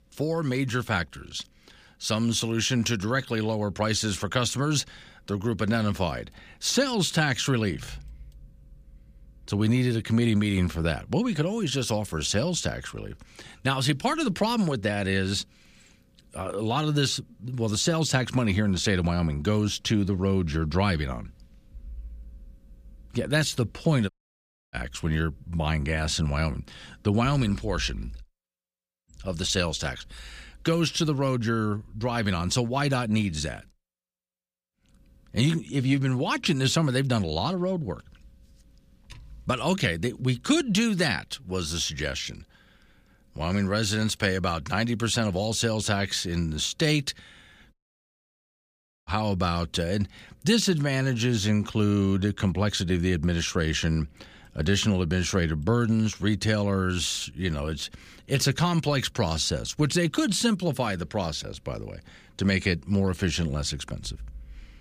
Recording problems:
audio cutting out; at 24 s for 0.5 s and at 48 s for 1.5 s

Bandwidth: 15 kHz